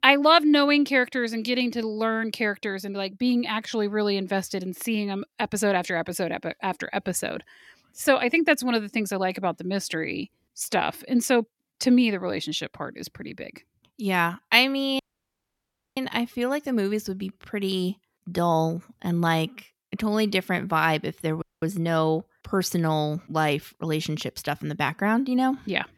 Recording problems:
audio cutting out; at 15 s for 1 s and at 21 s

